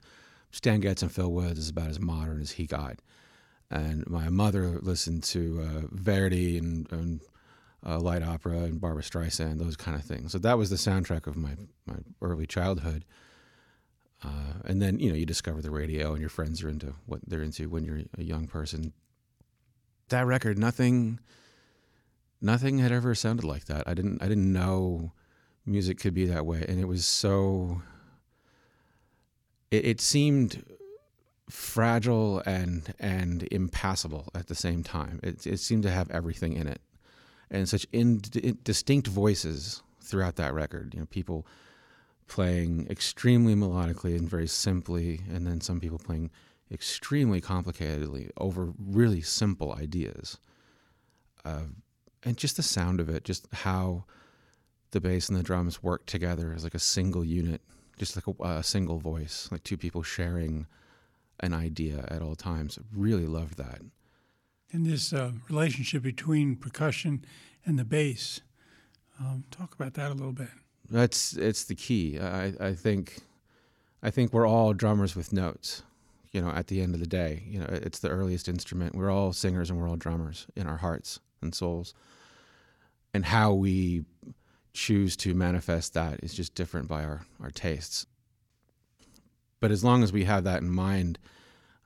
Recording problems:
none

